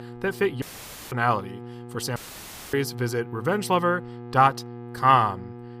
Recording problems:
electrical hum; faint; throughout; 60 Hz, 20 dB below the speech
audio cutting out; at 0.5 s for 0.5 s and at 2 s for 0.5 s

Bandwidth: 15 kHz